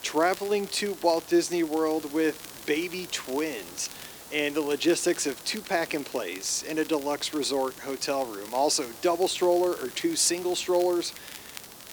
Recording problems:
thin; somewhat; fading below 300 Hz
hiss; noticeable; throughout; 15 dB below the speech
crackle, like an old record; noticeable; 20 dB below the speech

